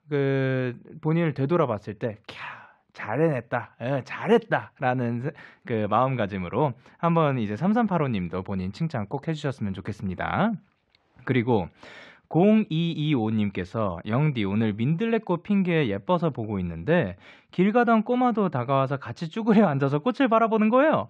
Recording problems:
muffled; slightly; fading above 3 kHz

